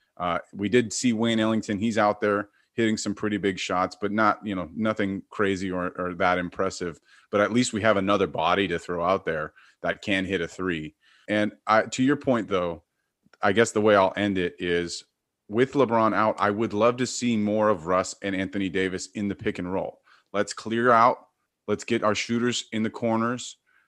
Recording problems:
none

